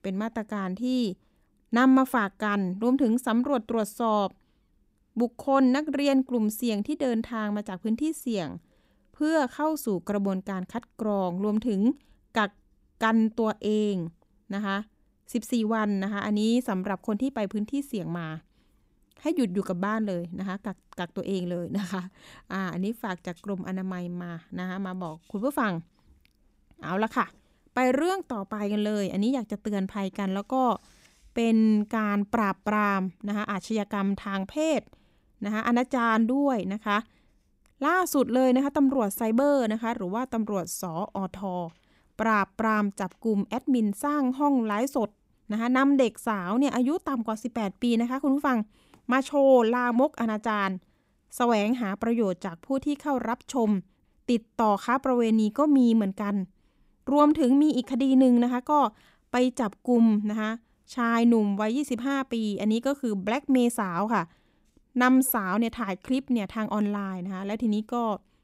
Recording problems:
none

